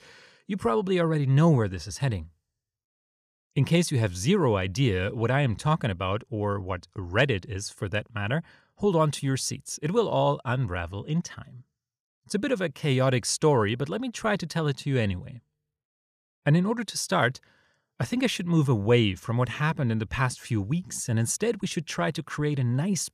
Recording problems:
none

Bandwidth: 14.5 kHz